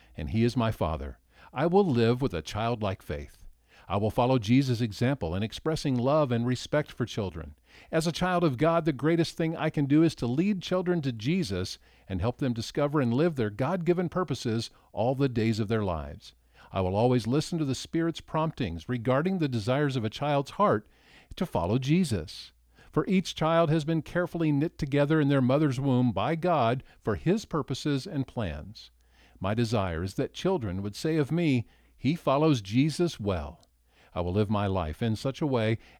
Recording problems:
none

